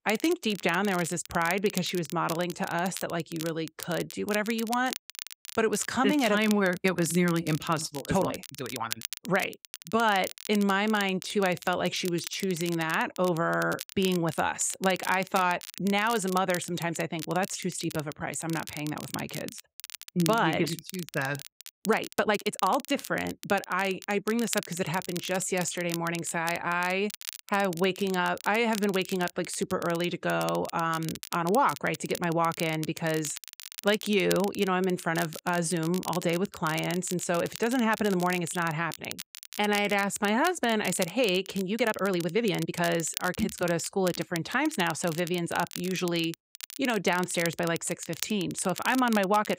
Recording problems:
crackle, like an old record; noticeable; 10 dB below the speech
uneven, jittery; strongly; from 8 to 43 s

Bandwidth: 15.5 kHz